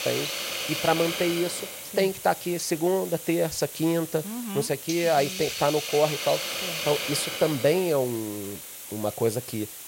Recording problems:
hiss; loud; throughout; 6 dB below the speech

